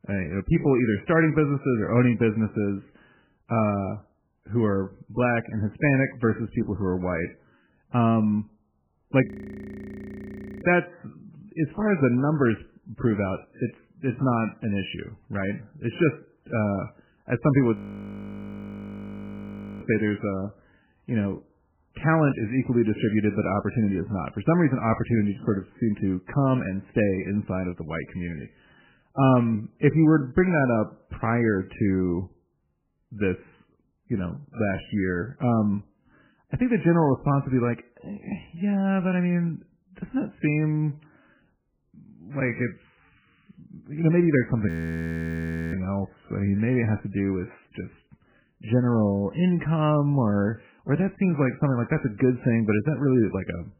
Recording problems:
garbled, watery; badly; nothing above 2.5 kHz
audio freezing; at 9.5 s for 1.5 s, at 18 s for 2 s and at 45 s for 1 s

